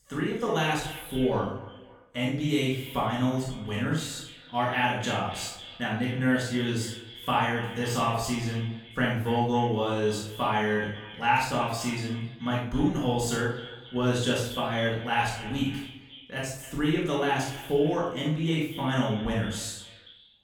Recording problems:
off-mic speech; far
echo of what is said; noticeable; throughout; 270 ms later, 15 dB below the speech
room echo; noticeable; dies away in 0.5 s

